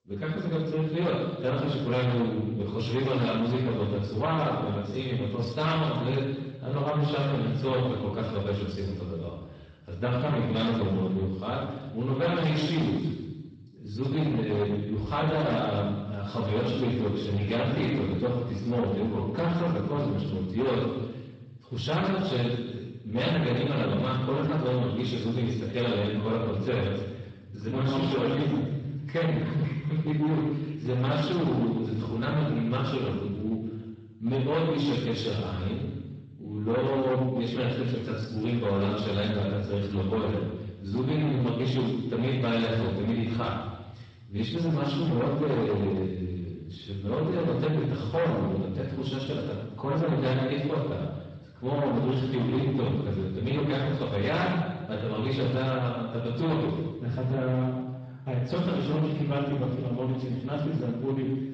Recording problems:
off-mic speech; far
room echo; noticeable; dies away in 1 s
distortion; slight; 14% of the sound clipped
garbled, watery; slightly; nothing above 7.5 kHz

